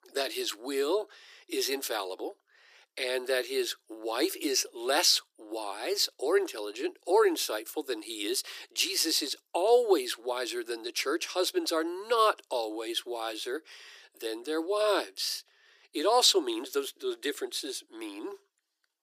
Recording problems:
thin; very; fading below 300 Hz

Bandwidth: 15 kHz